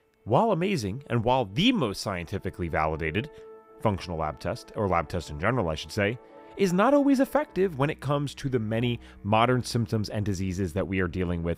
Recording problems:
background music; faint; throughout; 25 dB below the speech

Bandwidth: 15.5 kHz